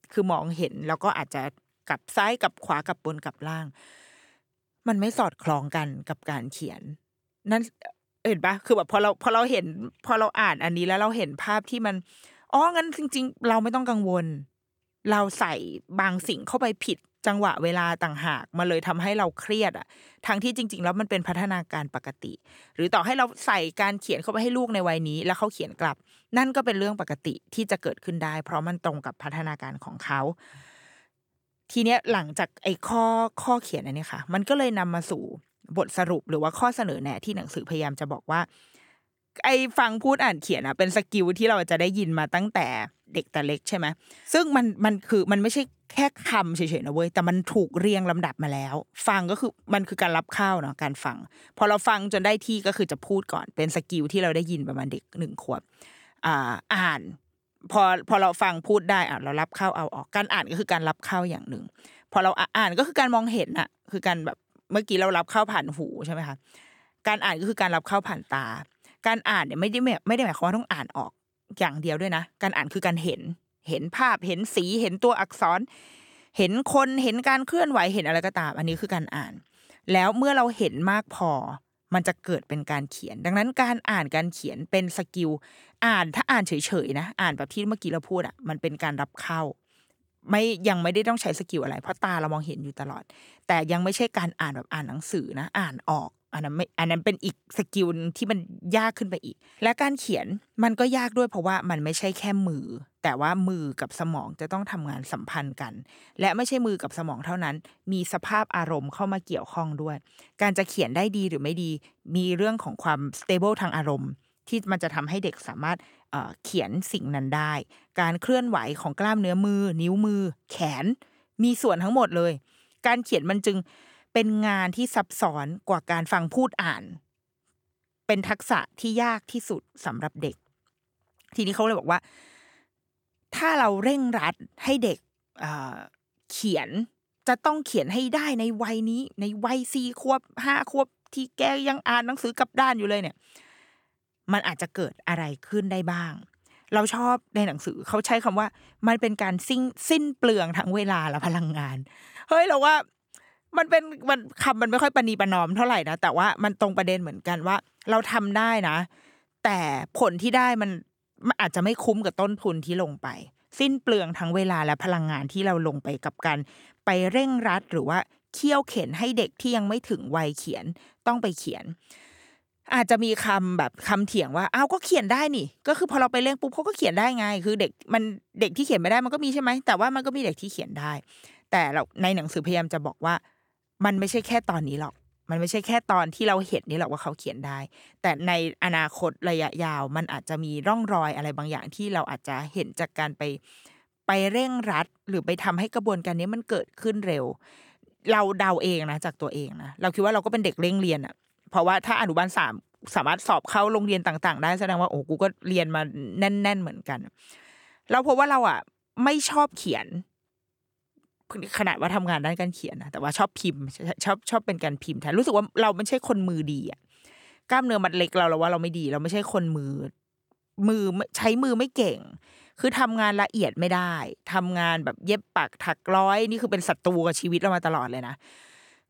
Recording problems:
none

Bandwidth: 18.5 kHz